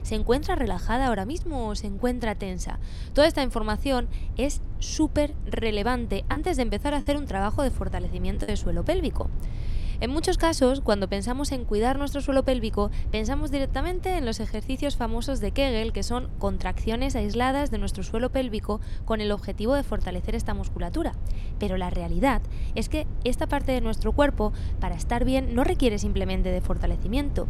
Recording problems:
low rumble; faint; throughout; 20 dB below the speech
choppy; occasionally; from 5.5 to 9 s; 5% of the speech affected

